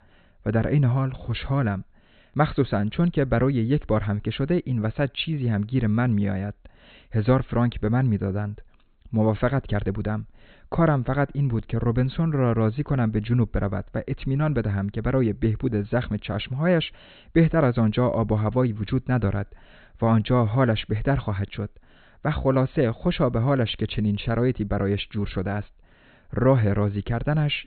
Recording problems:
high frequencies cut off; severe; nothing above 4 kHz

